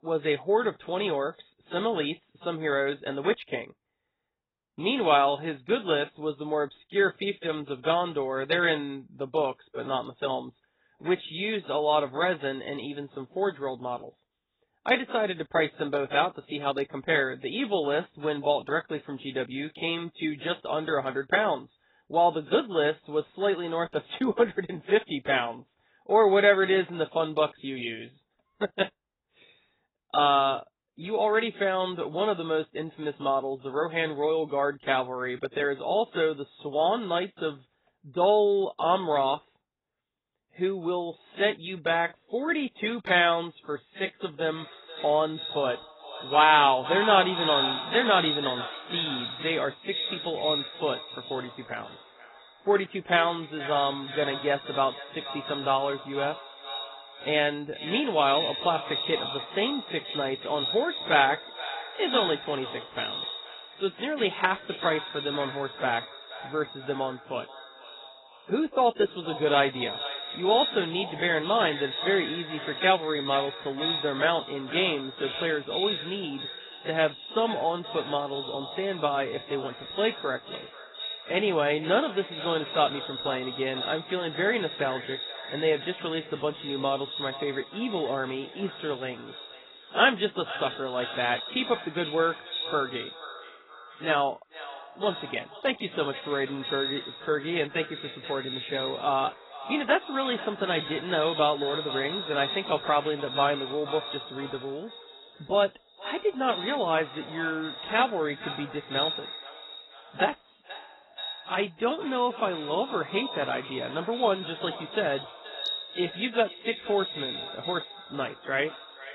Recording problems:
echo of what is said; strong; from 45 s on; 480 ms later, 8 dB below the speech
garbled, watery; badly; nothing above 4 kHz

